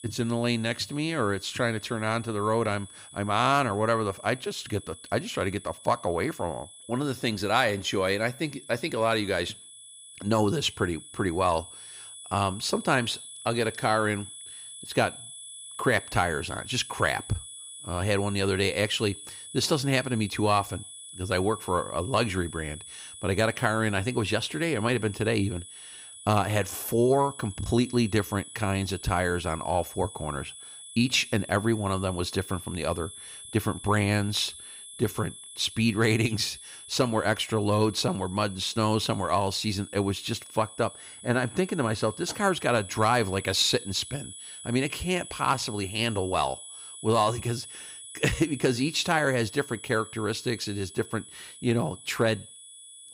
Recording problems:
high-pitched whine; noticeable; throughout; 10.5 kHz, 15 dB below the speech

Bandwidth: 15.5 kHz